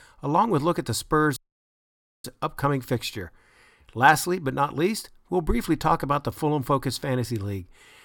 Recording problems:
audio cutting out; at 1.5 s for 1 s

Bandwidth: 17.5 kHz